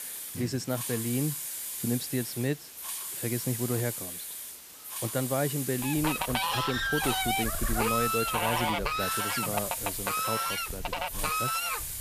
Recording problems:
animal sounds; very loud; throughout; 3 dB above the speech
hiss; loud; throughout; 1 dB below the speech

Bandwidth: 14.5 kHz